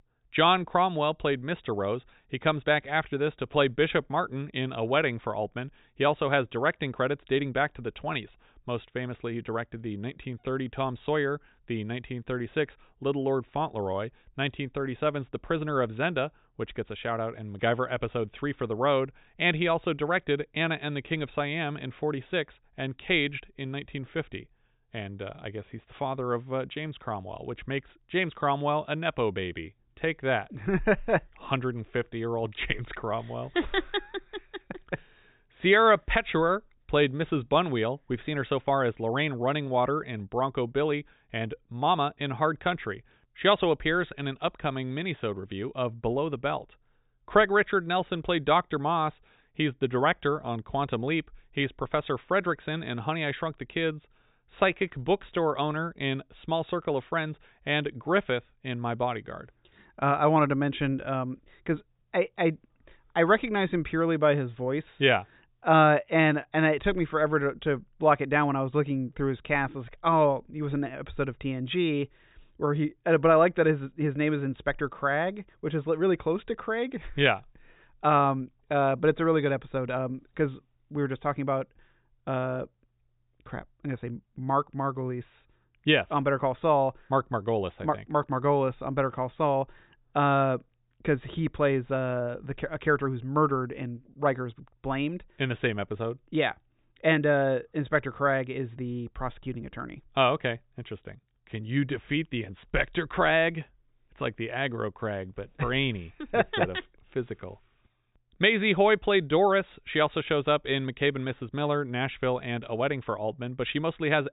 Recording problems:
high frequencies cut off; severe; nothing above 4 kHz

